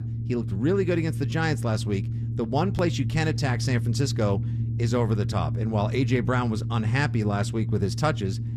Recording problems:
low rumble; noticeable; throughout; 10 dB below the speech

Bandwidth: 13.5 kHz